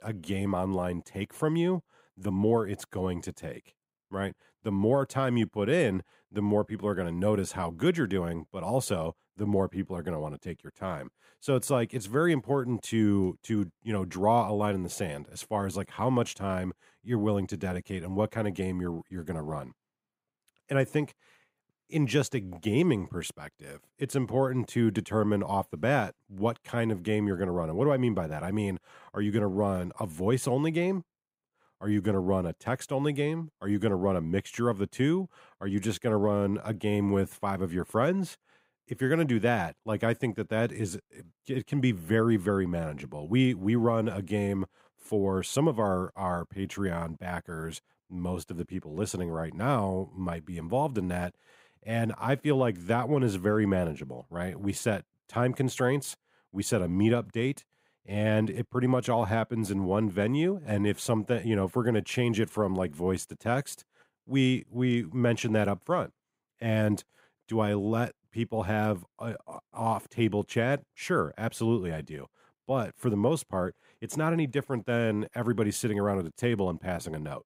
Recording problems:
none

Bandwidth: 15.5 kHz